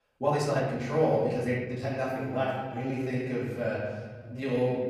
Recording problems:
off-mic speech; far
room echo; noticeable; dies away in 1.4 s
uneven, jittery; strongly

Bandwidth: 15 kHz